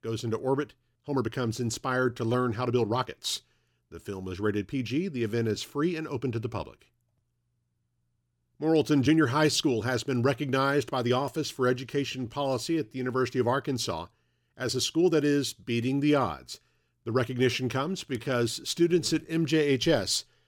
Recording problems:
uneven, jittery; strongly; from 1 to 19 s

